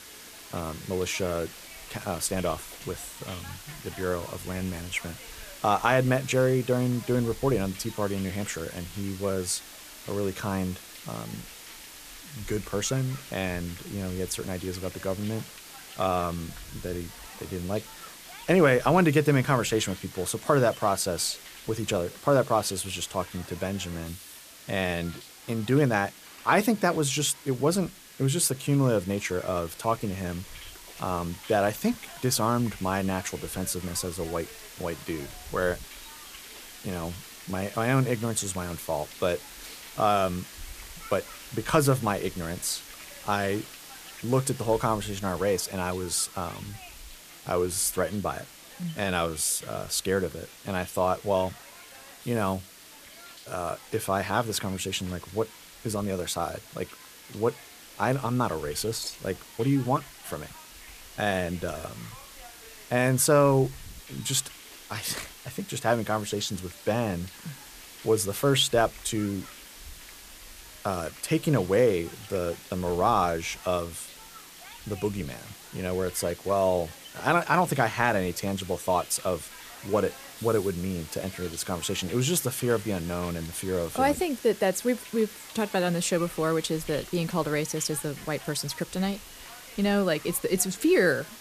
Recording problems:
hiss; noticeable; throughout; 15 dB below the speech

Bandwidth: 14.5 kHz